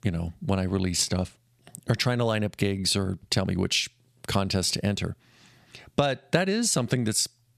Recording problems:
squashed, flat; somewhat

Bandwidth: 14.5 kHz